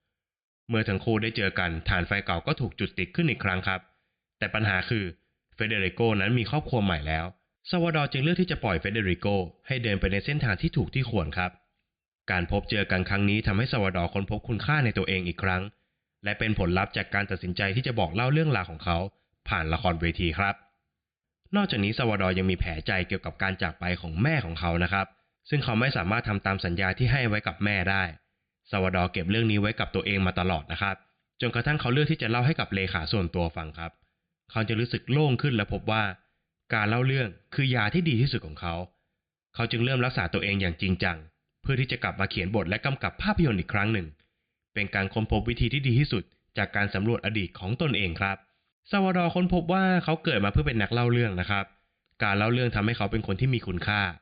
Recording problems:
high frequencies cut off; severe; nothing above 5 kHz

